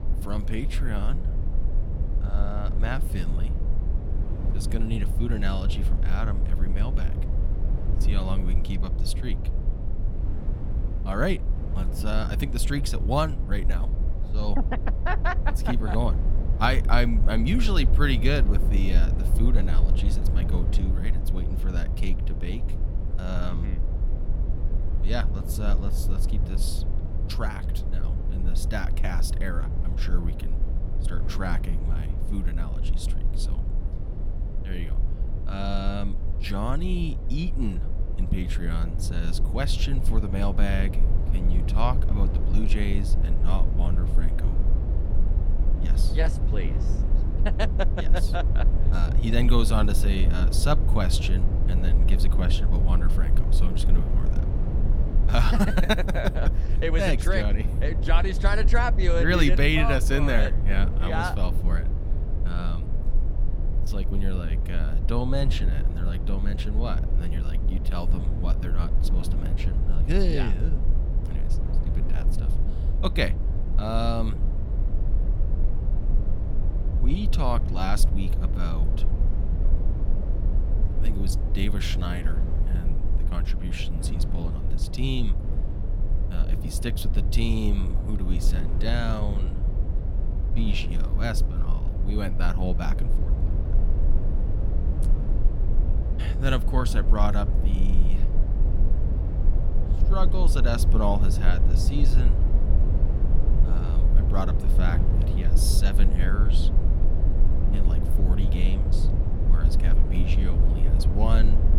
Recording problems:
low rumble; loud; throughout; 10 dB below the speech
wind noise on the microphone; occasional gusts; 20 dB below the speech

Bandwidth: 16.5 kHz